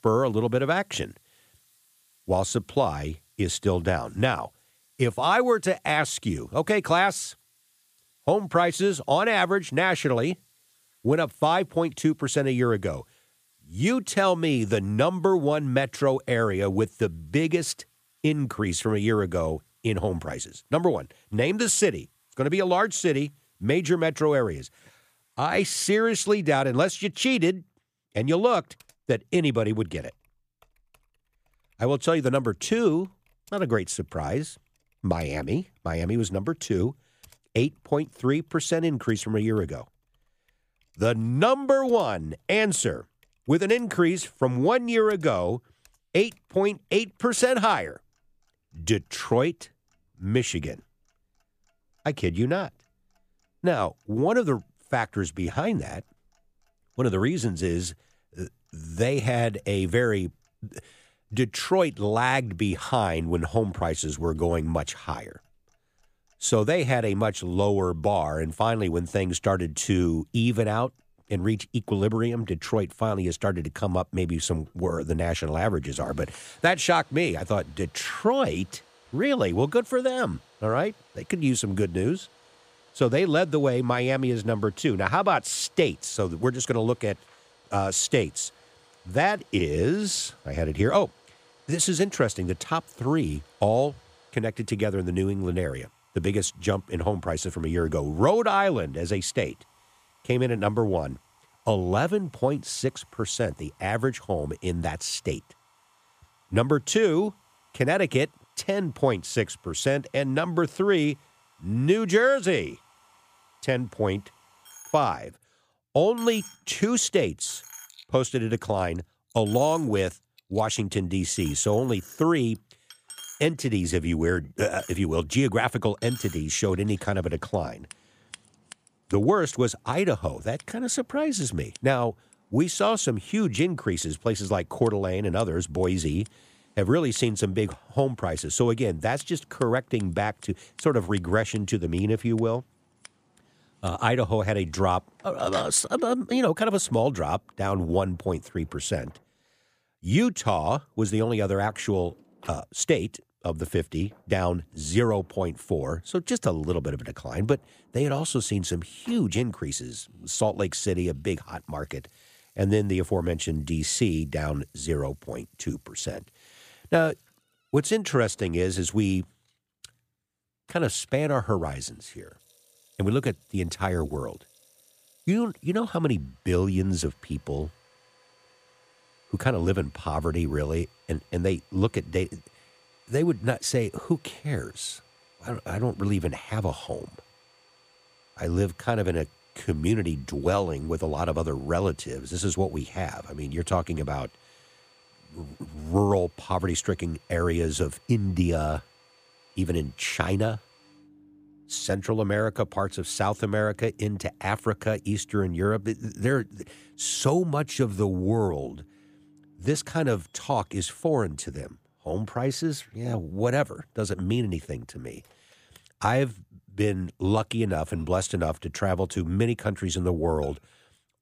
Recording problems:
household noises; faint; throughout; 25 dB below the speech

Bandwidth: 15 kHz